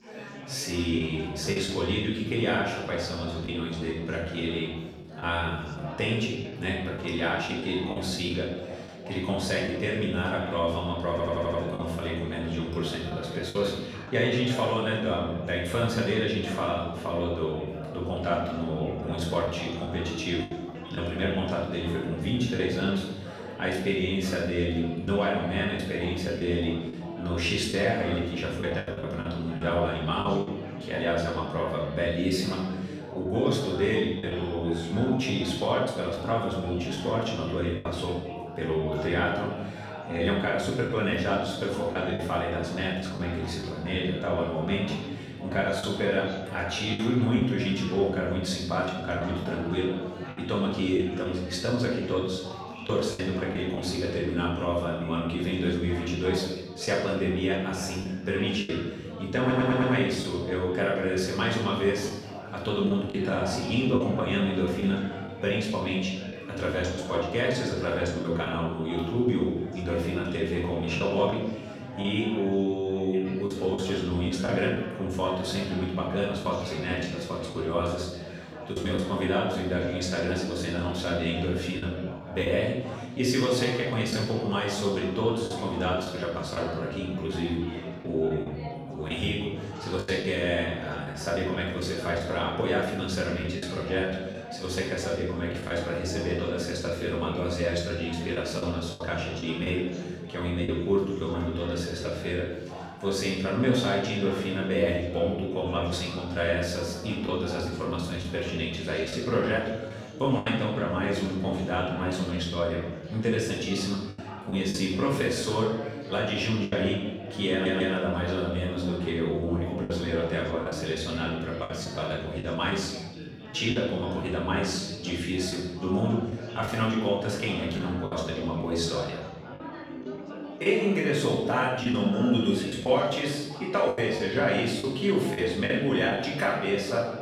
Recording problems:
off-mic speech; far
room echo; noticeable; dies away in 1.1 s
chatter from many people; noticeable; throughout; 10 dB below the speech
choppy; occasionally; 3% of the speech affected
audio stuttering; at 11 s, at 59 s and at 1:58

